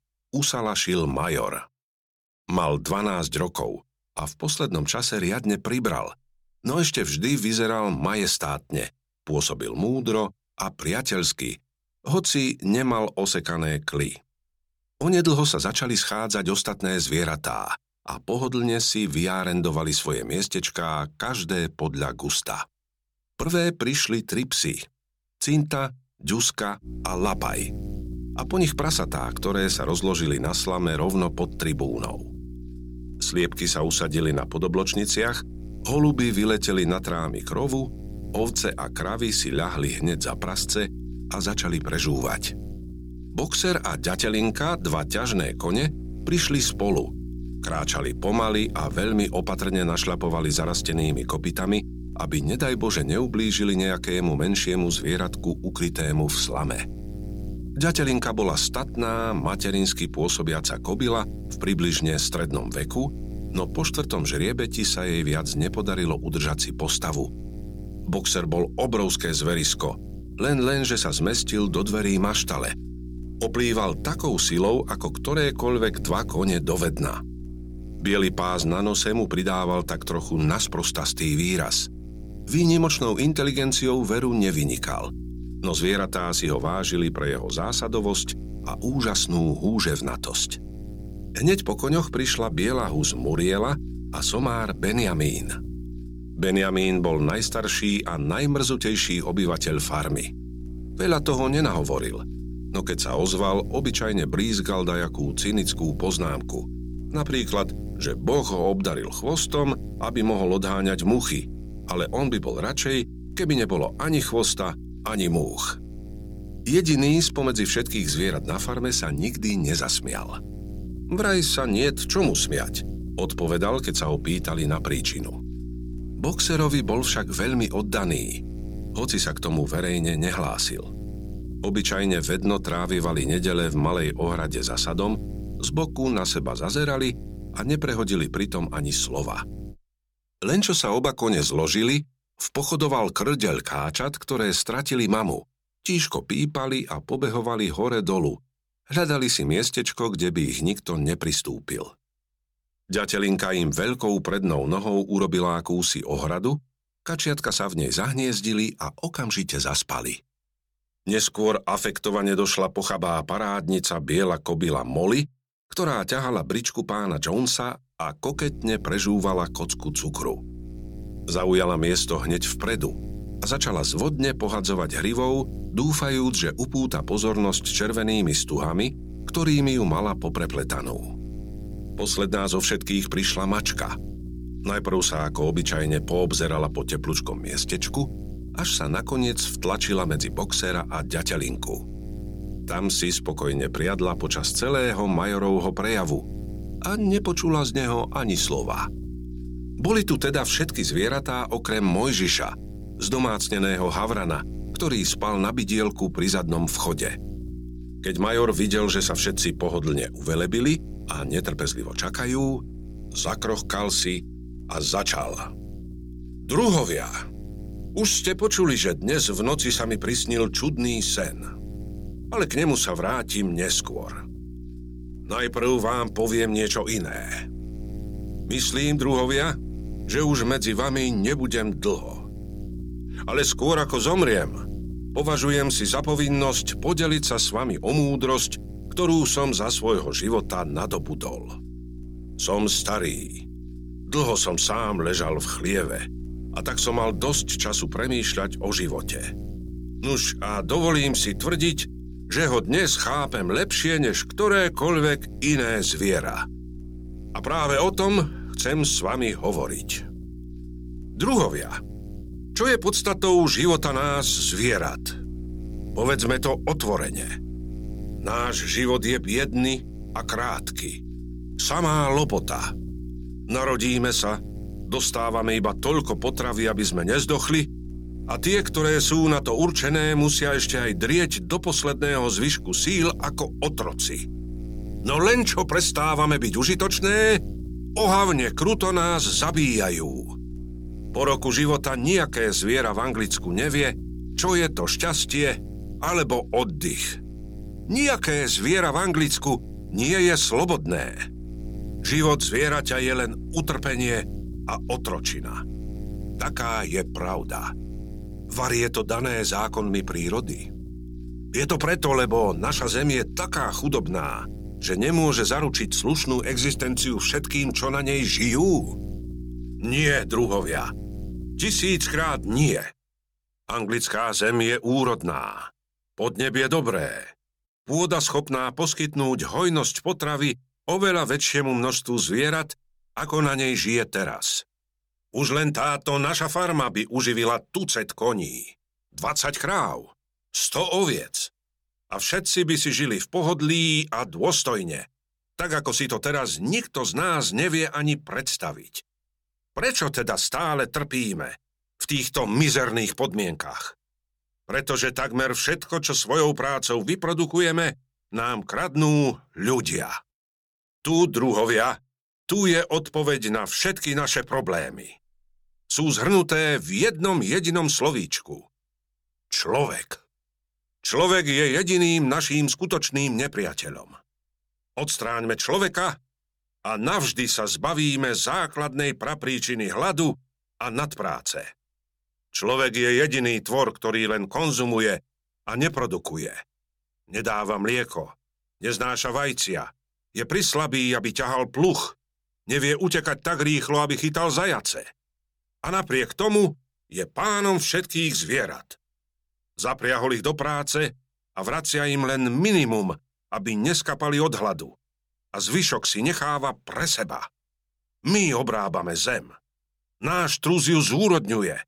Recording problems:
electrical hum; faint; from 27 s to 2:20 and from 2:48 to 5:23; 60 Hz, 20 dB below the speech

